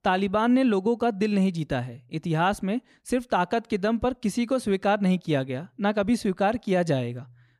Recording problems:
none

